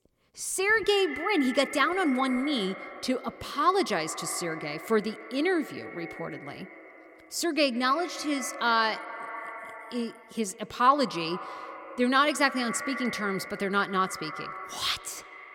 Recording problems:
echo of what is said; strong; throughout; 140 ms later, 10 dB below the speech

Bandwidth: 17 kHz